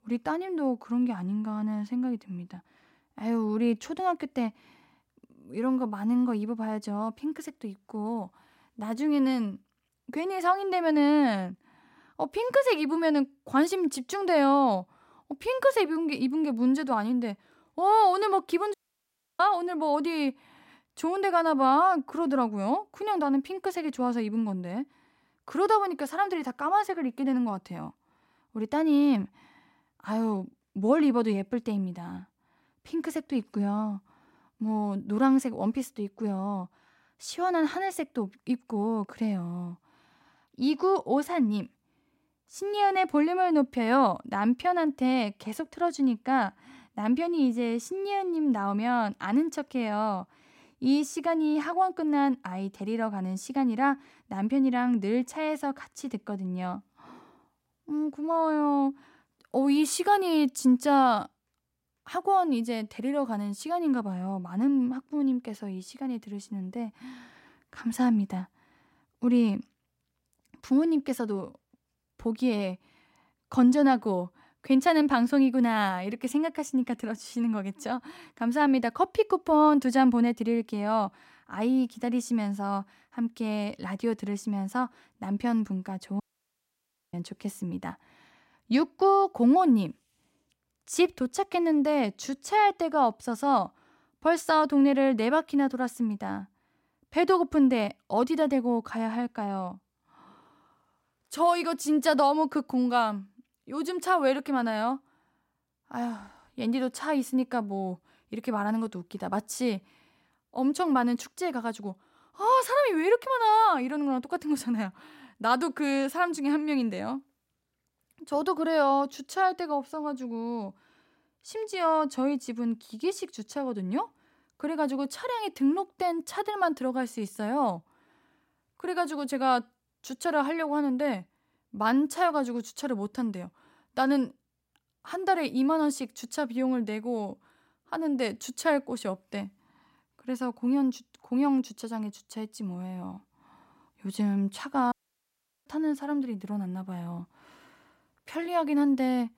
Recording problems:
audio cutting out; at 19 s for 0.5 s, at 1:26 for 1 s and at 2:25 for 0.5 s

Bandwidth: 16 kHz